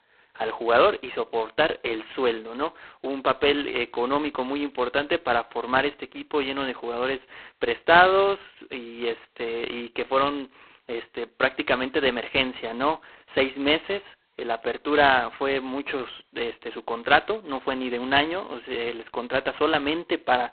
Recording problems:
phone-call audio; poor line; nothing above 4 kHz

